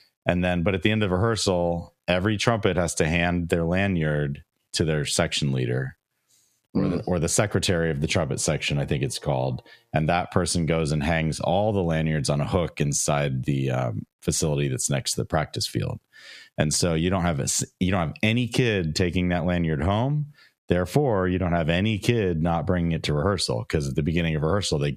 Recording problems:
squashed, flat; heavily

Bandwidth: 14.5 kHz